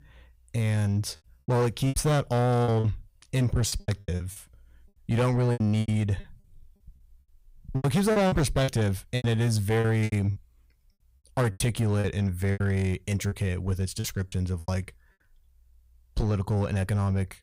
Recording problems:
distortion; slight; 9% of the sound clipped
choppy; very; 13% of the speech affected

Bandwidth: 15.5 kHz